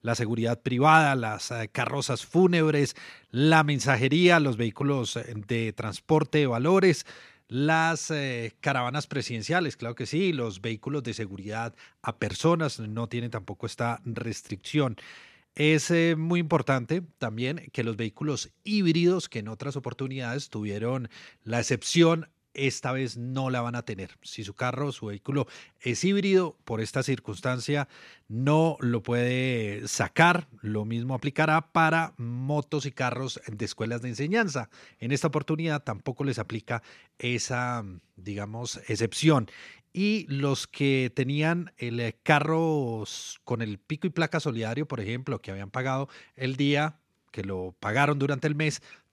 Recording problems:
none

